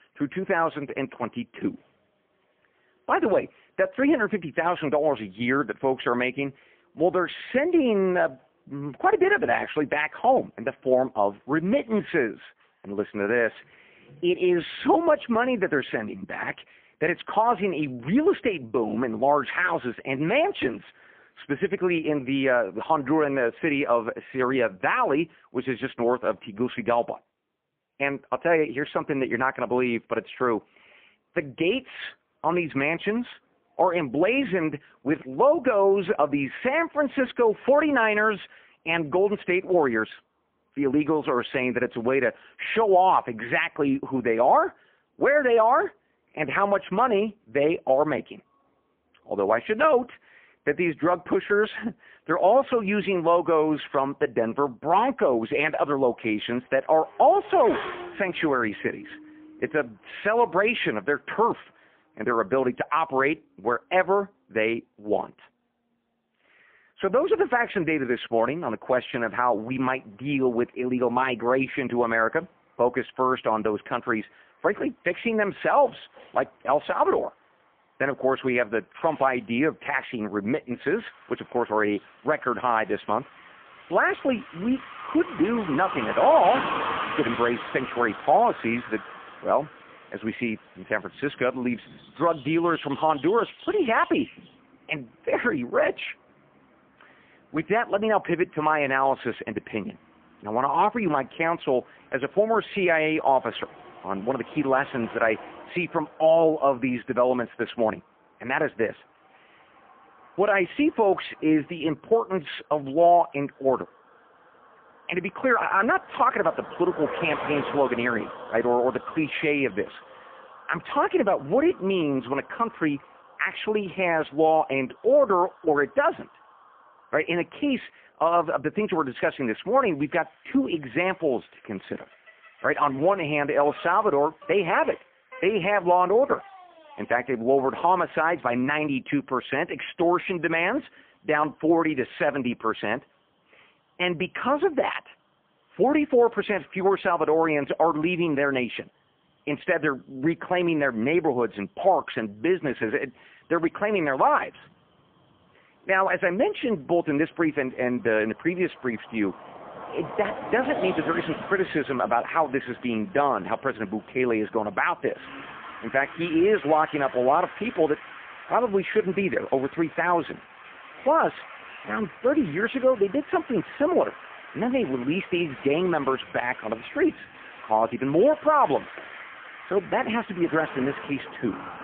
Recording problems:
phone-call audio; poor line
traffic noise; noticeable; throughout; 15 dB below the speech

